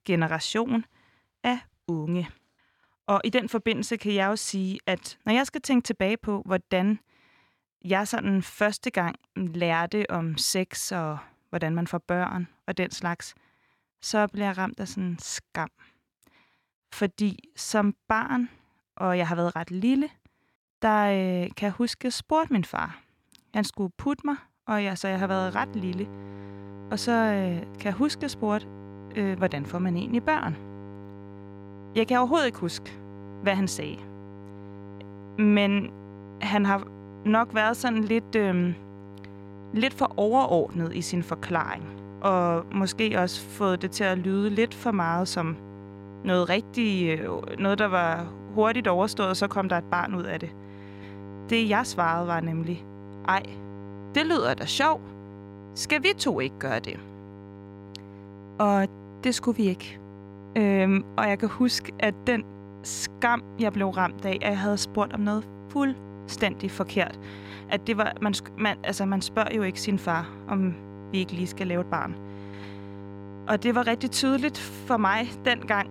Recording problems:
electrical hum; noticeable; from 25 s on; 50 Hz, 20 dB below the speech

